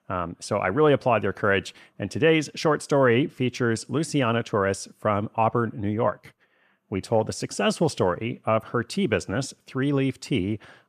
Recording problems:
none

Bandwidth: 14.5 kHz